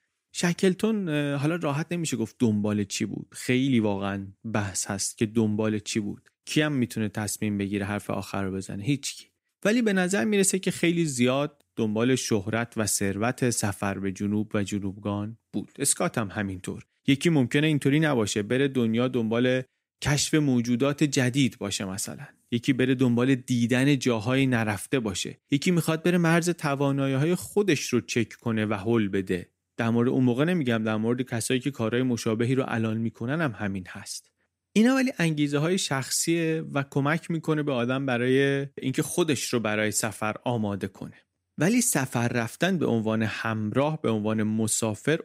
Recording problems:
none

